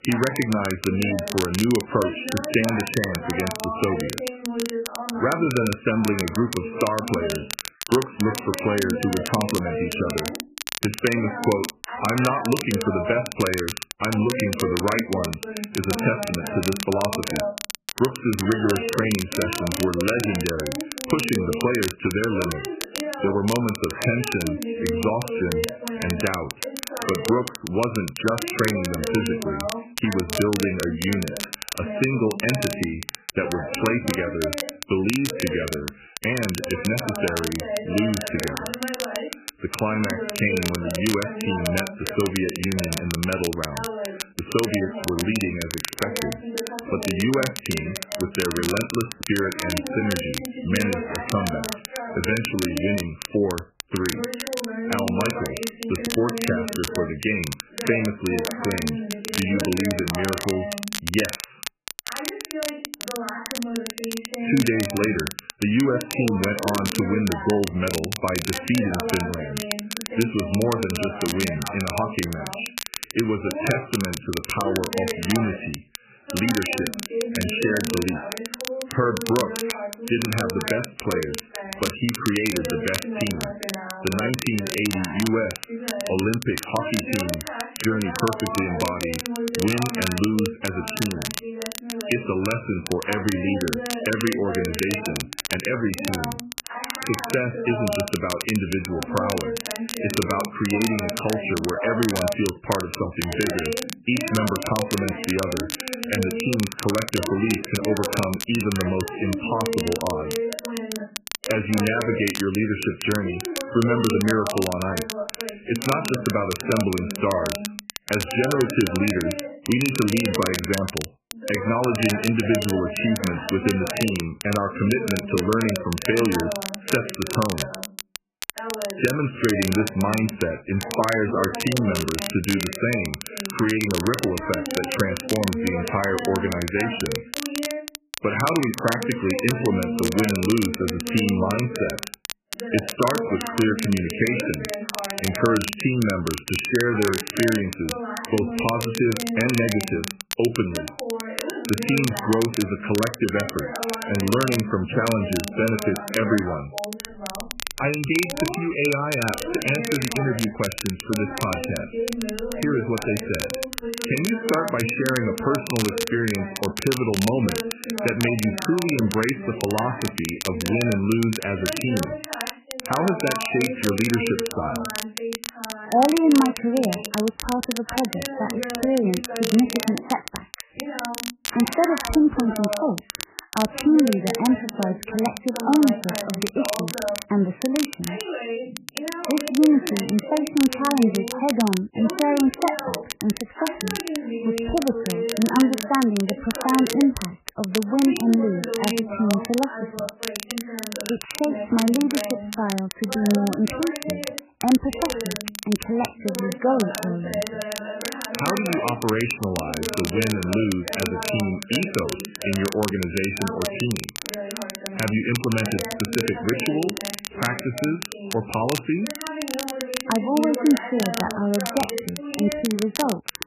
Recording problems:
garbled, watery; badly; nothing above 3 kHz
voice in the background; loud; throughout; 8 dB below the speech
crackle, like an old record; loud; 8 dB below the speech

